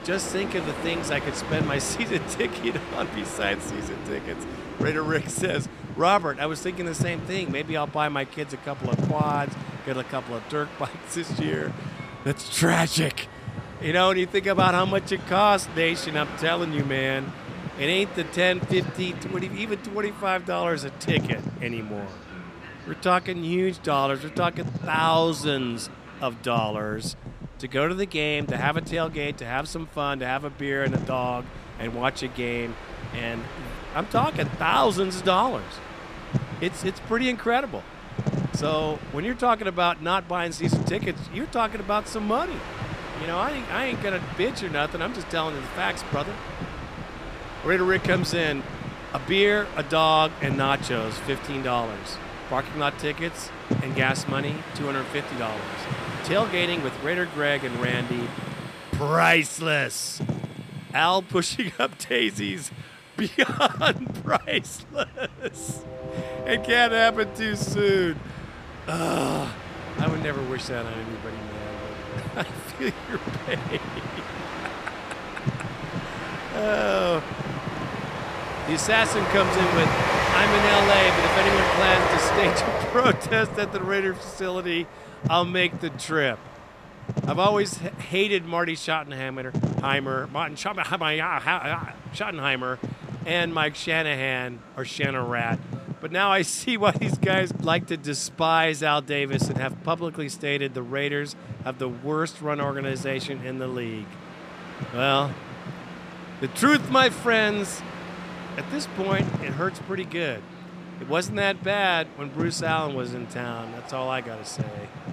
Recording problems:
train or aircraft noise; loud; throughout; 7 dB below the speech
wind noise on the microphone; occasional gusts; 15 dB below the speech

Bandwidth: 14.5 kHz